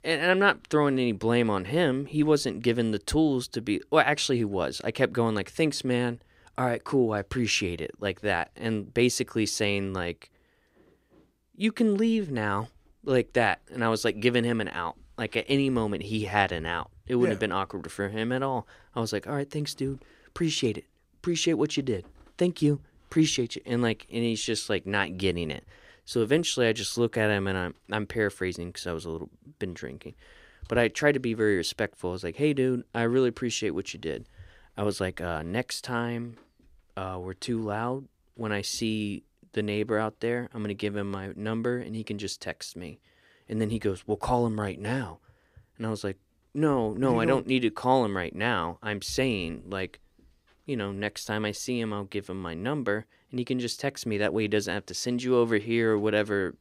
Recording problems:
none

